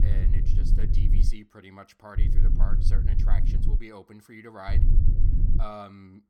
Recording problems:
low rumble; loud; until 1.5 s, from 2 to 4 s and at 4.5 s; 2 dB below the speech

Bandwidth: 18 kHz